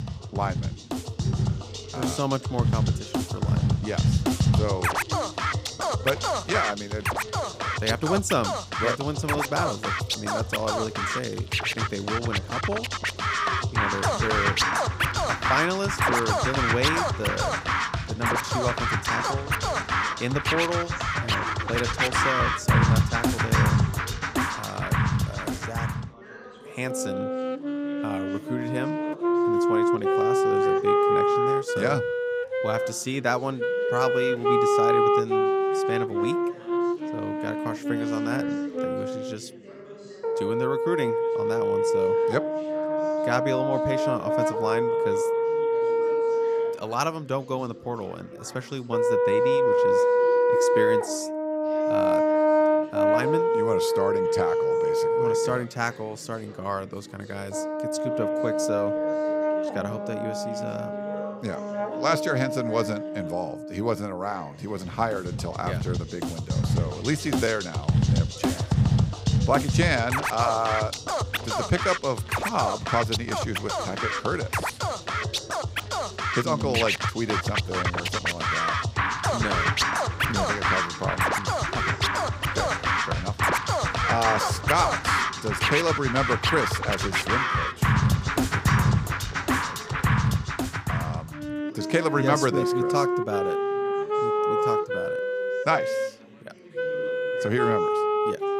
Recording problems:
background music; very loud; throughout; 5 dB above the speech
background chatter; noticeable; throughout; 3 voices, 15 dB below the speech

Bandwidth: 15.5 kHz